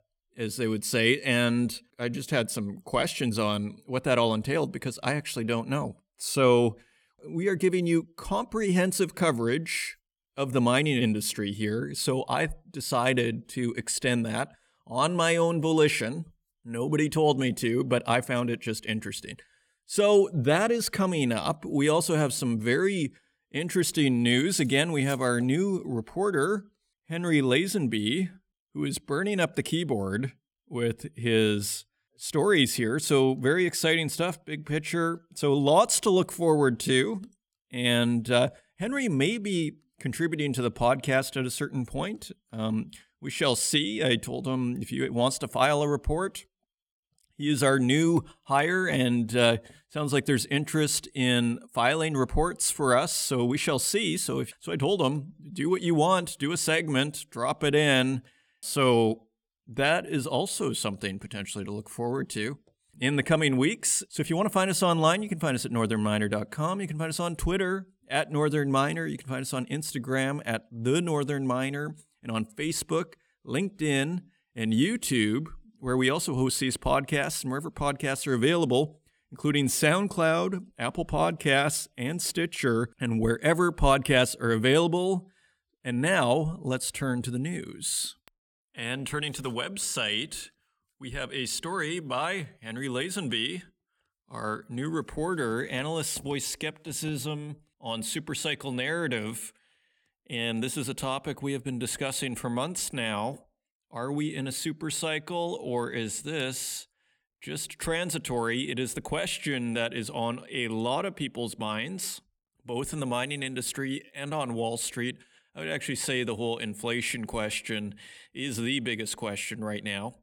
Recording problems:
none

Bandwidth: 18 kHz